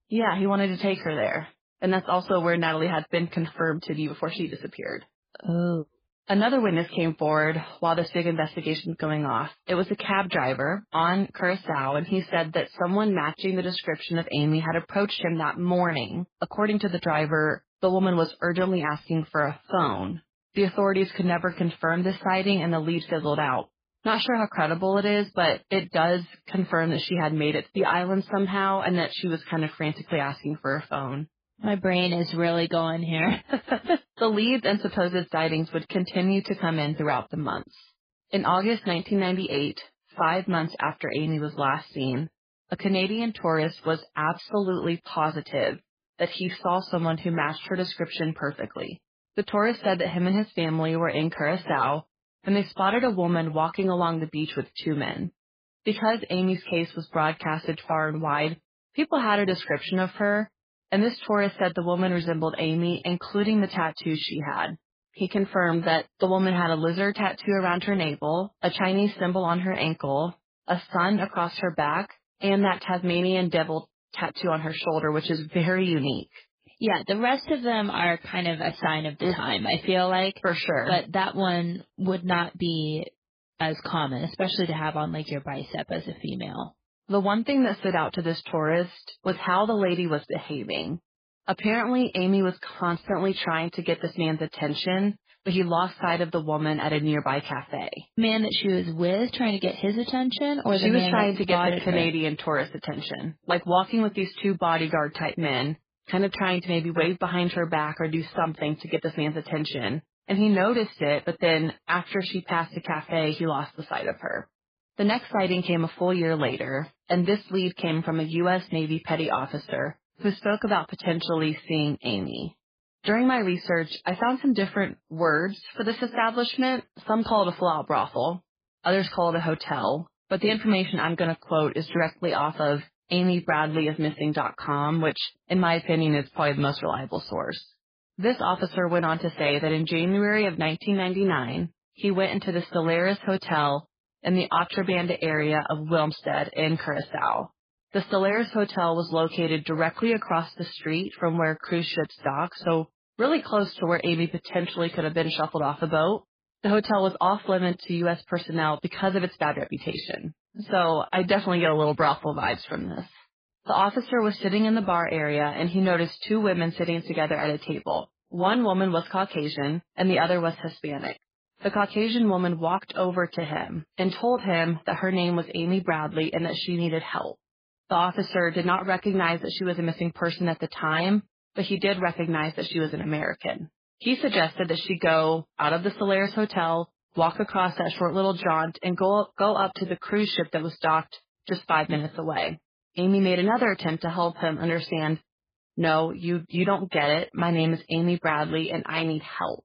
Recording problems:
garbled, watery; badly; nothing above 4.5 kHz

